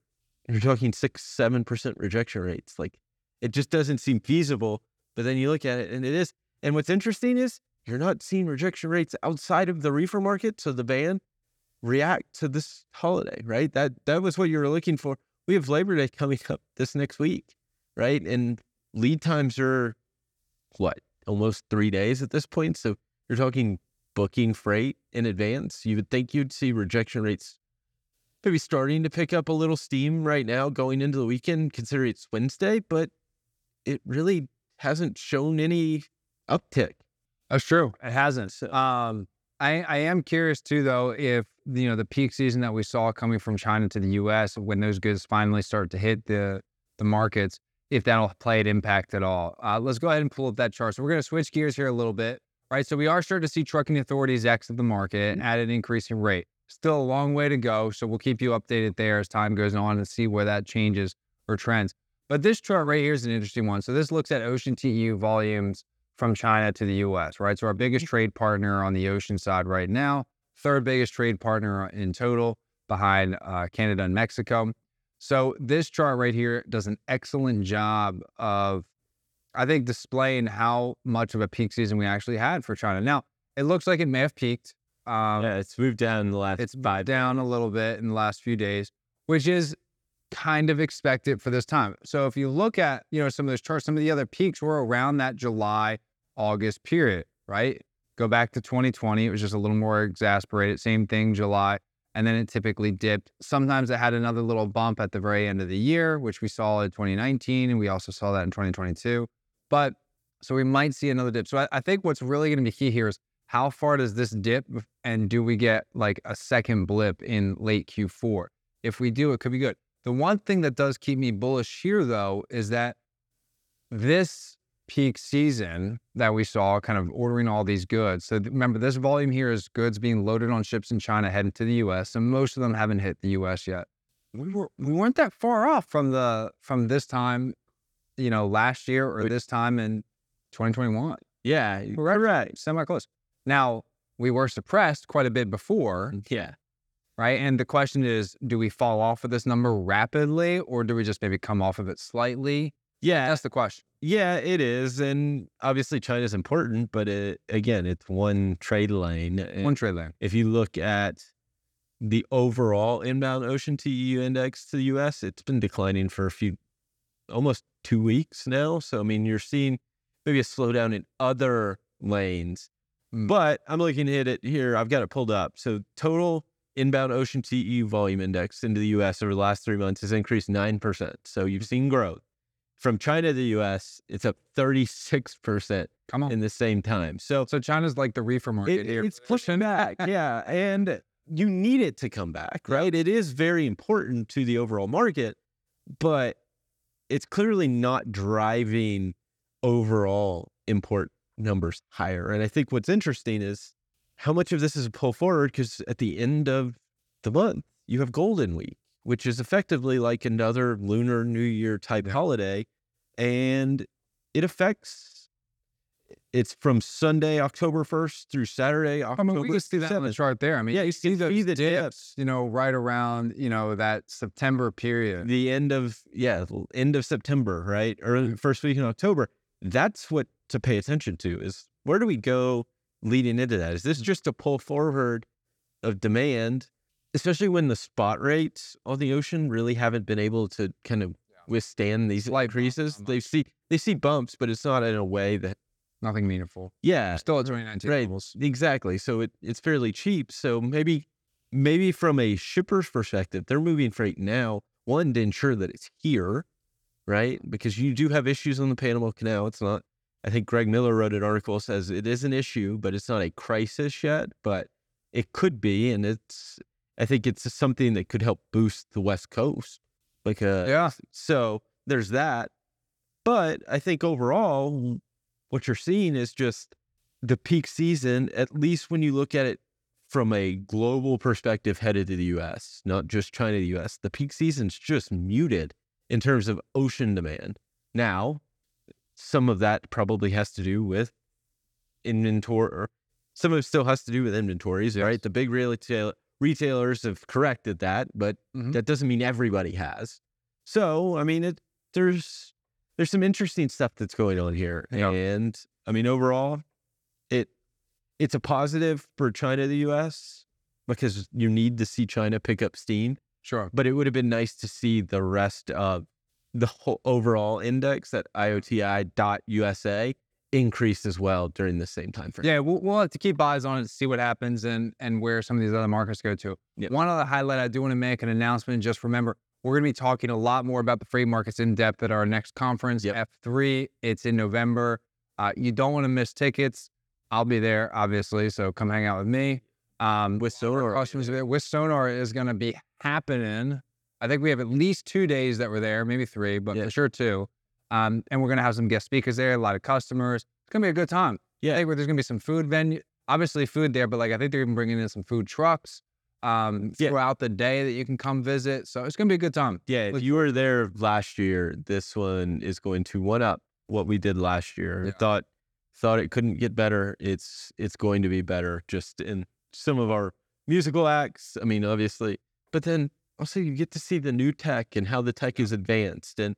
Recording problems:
none

